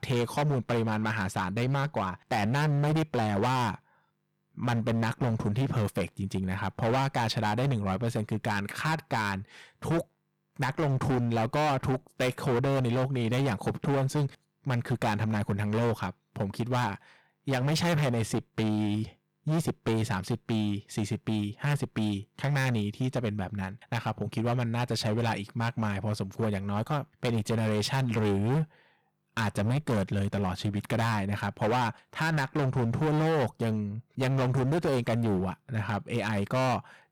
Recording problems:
distortion; heavy; 19% of the sound clipped

